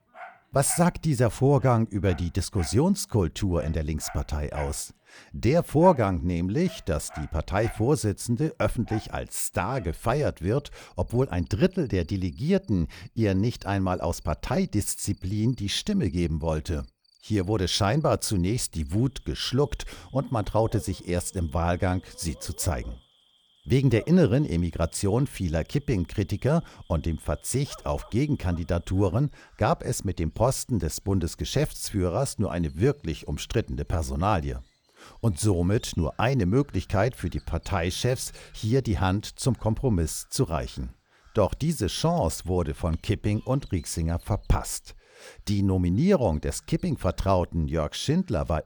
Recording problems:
animal sounds; faint; throughout; 25 dB below the speech

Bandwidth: 18.5 kHz